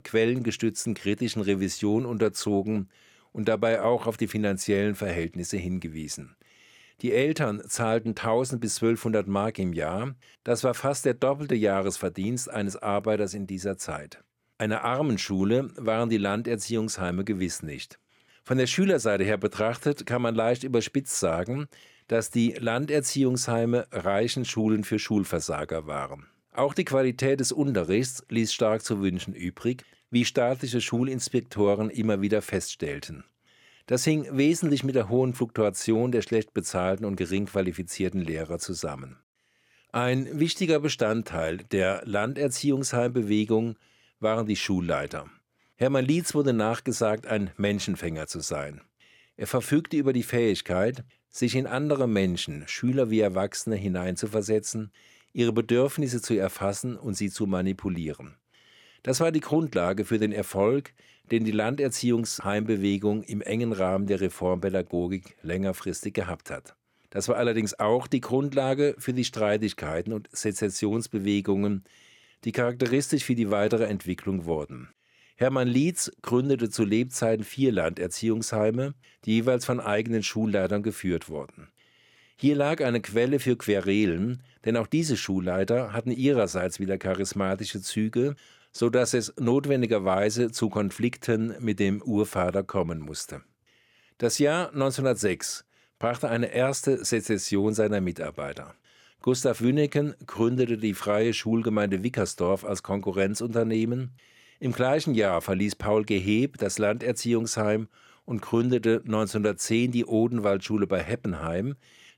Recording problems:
none

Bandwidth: 17.5 kHz